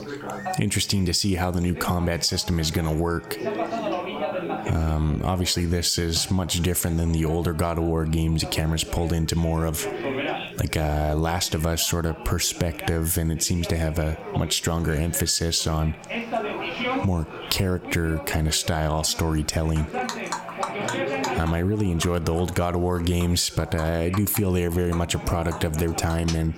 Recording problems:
squashed, flat; somewhat, background pumping
background chatter; loud; throughout; 3 voices, 10 dB below the speech
animal sounds; noticeable; throughout; 15 dB below the speech

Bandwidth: 16.5 kHz